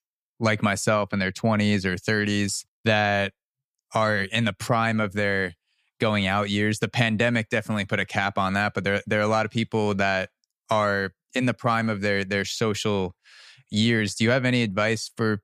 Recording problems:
none

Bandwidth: 15 kHz